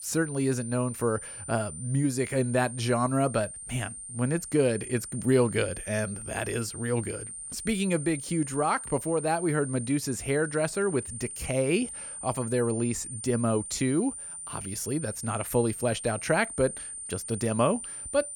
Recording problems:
high-pitched whine; loud; throughout; 9 kHz, 8 dB below the speech

